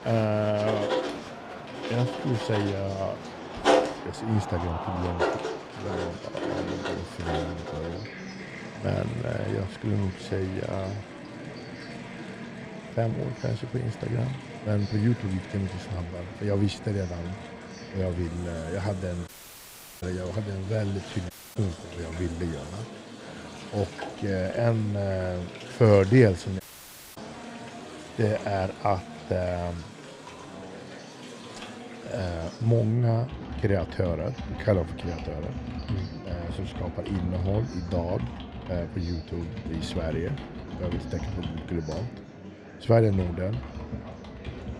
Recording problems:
muffled; slightly; fading above 2 kHz
household noises; loud; throughout; 8 dB below the speech
murmuring crowd; noticeable; throughout; 15 dB below the speech
uneven, jittery; slightly; from 7.5 to 41 s
audio cutting out; at 19 s for 0.5 s, at 21 s and at 27 s for 0.5 s

